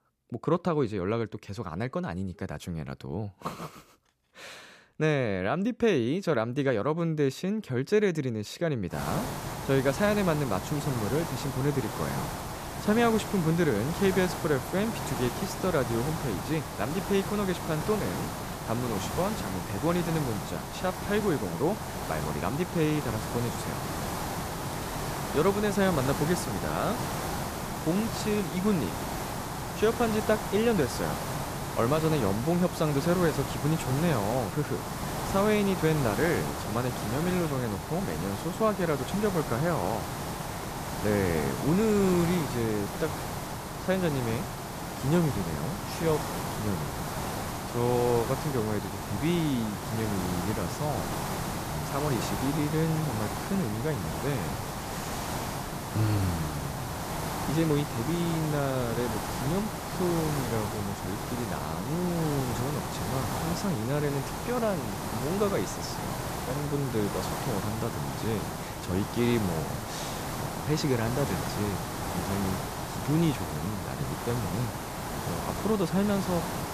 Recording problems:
hiss; loud; from 9 s on; 4 dB below the speech

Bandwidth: 14.5 kHz